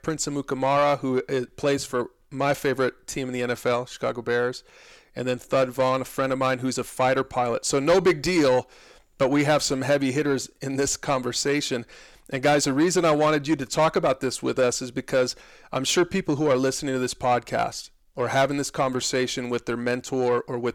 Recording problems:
distortion; slight; 10 dB below the speech

